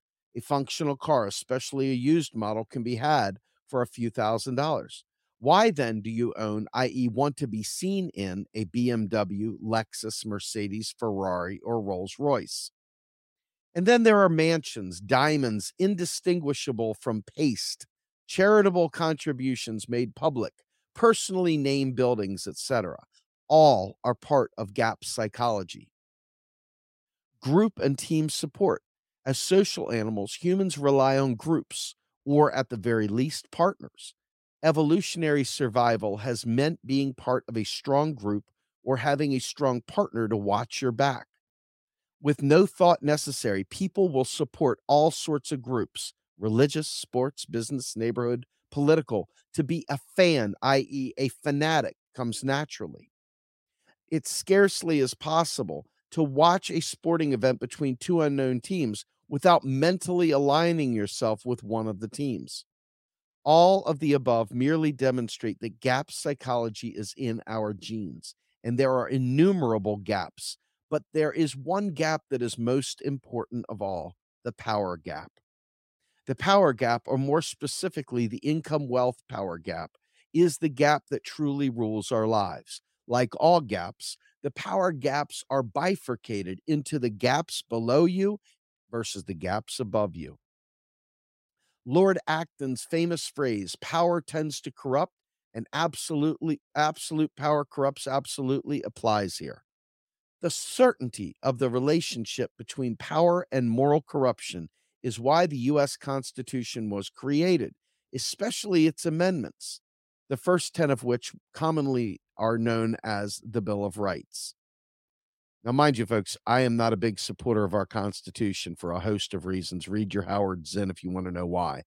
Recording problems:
none

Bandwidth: 16 kHz